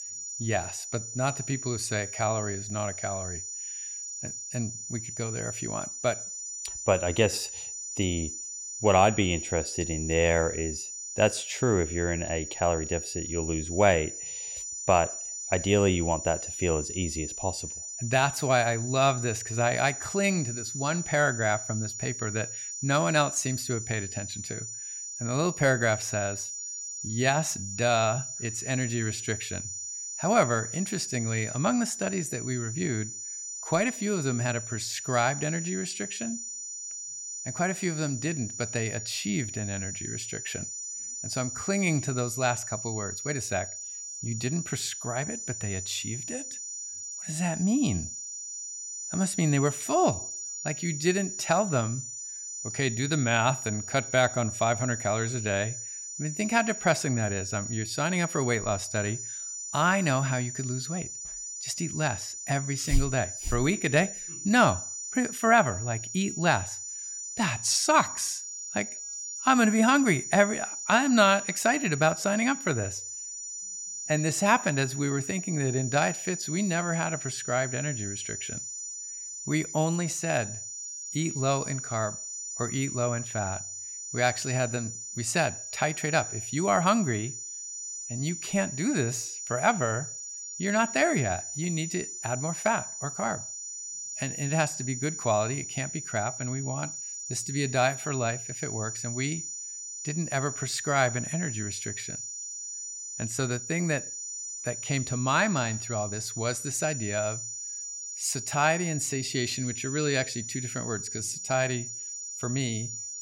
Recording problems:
high-pitched whine; loud; throughout; 7 kHz, 6 dB below the speech

